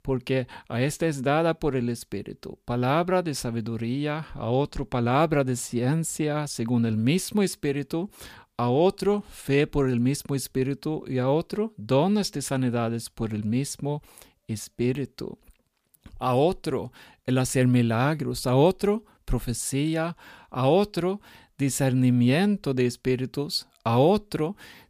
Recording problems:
none

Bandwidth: 15 kHz